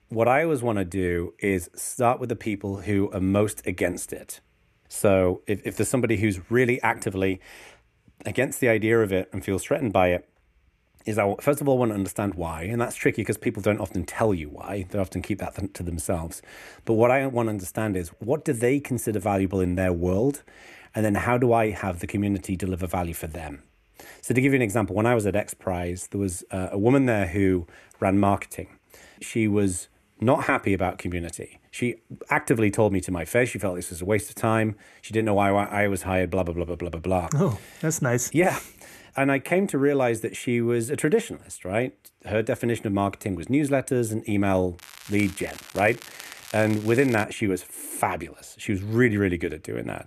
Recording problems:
crackling; noticeable; from 45 to 47 s; 15 dB below the speech

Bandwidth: 13.5 kHz